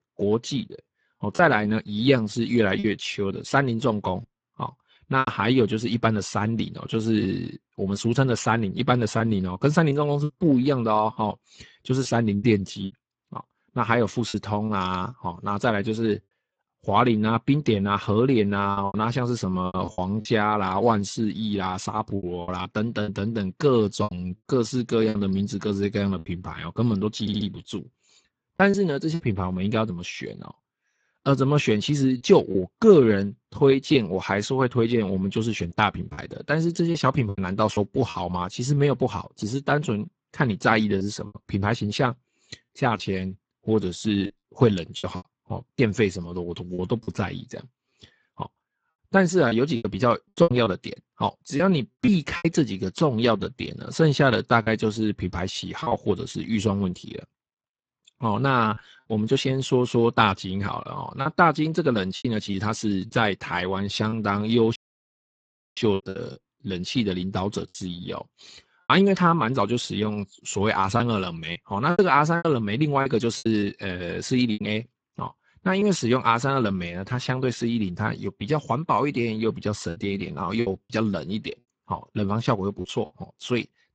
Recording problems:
garbled, watery; badly; nothing above 7.5 kHz
choppy; very; 5% of the speech affected
audio stuttering; at 27 s
audio cutting out; at 1:05 for 1 s

